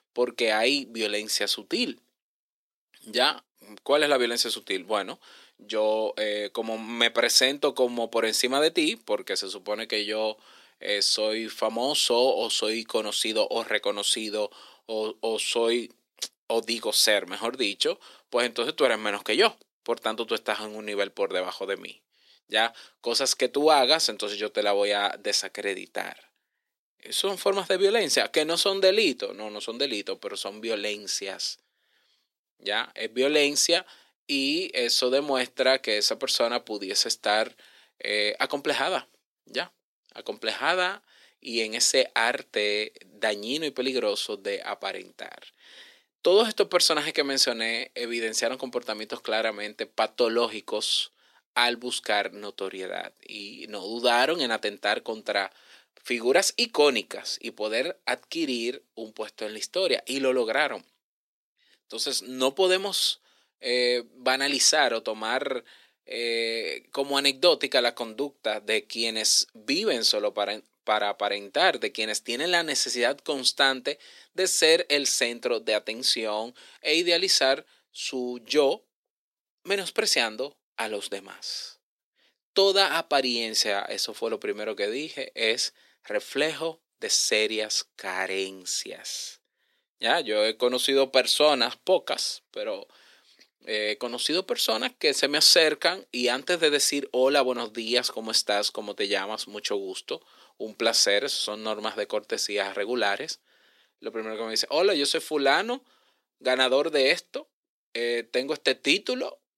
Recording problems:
thin; somewhat; fading below 300 Hz

